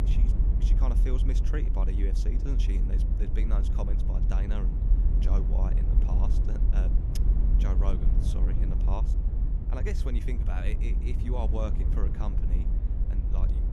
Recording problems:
low rumble; loud; throughout; 3 dB below the speech
electrical hum; very faint; from 4.5 to 12 s; 60 Hz, 30 dB below the speech

